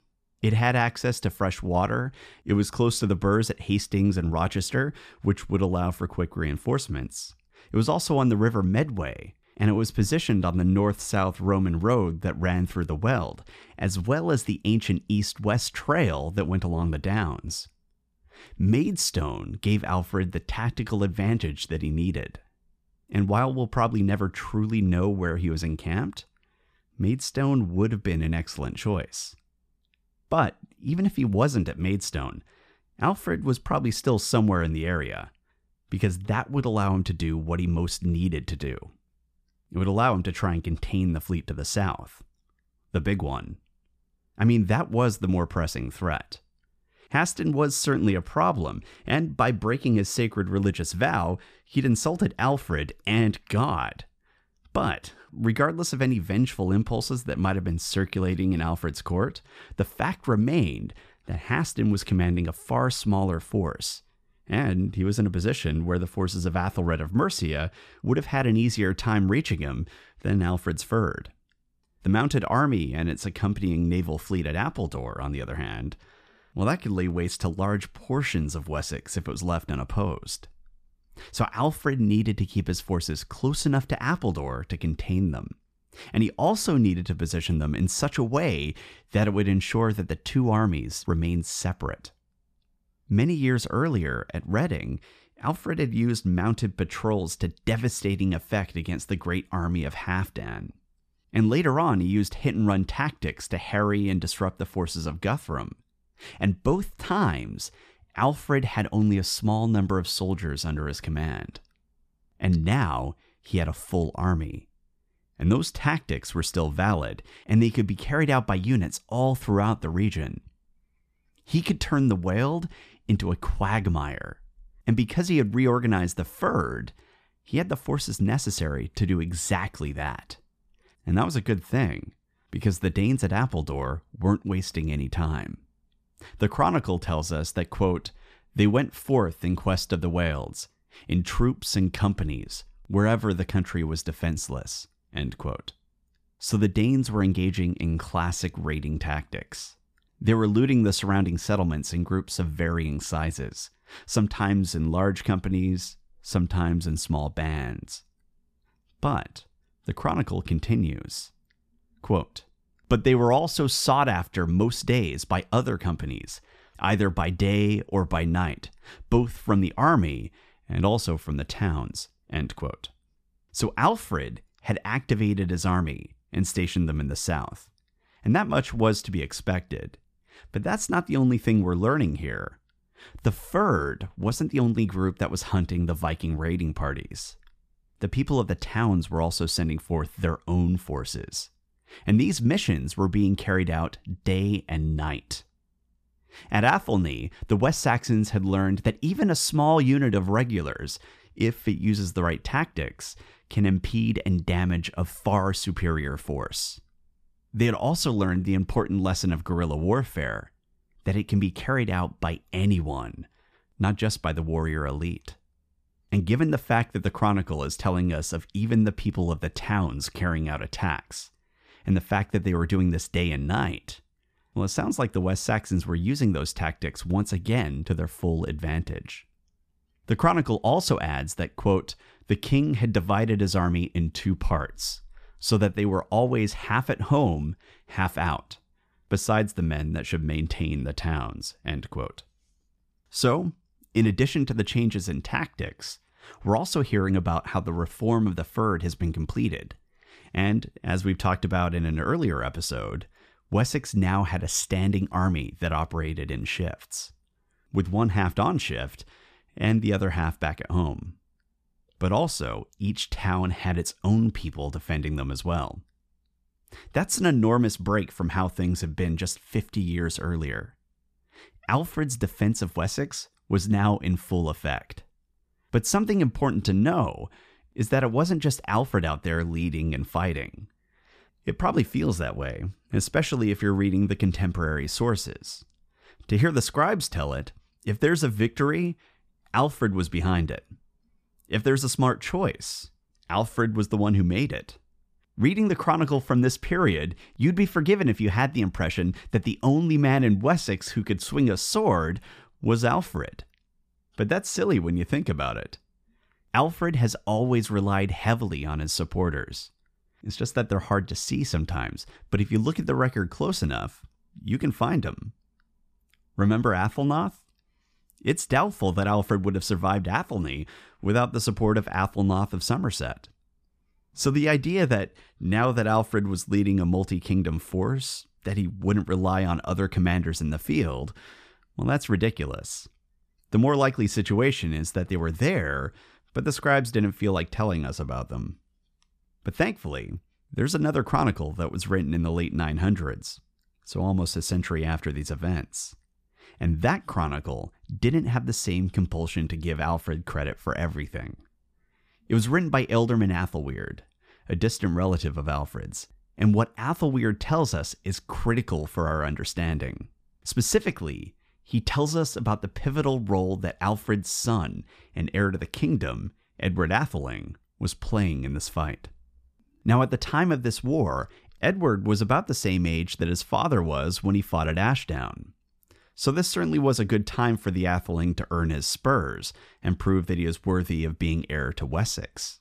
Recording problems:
none

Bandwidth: 14.5 kHz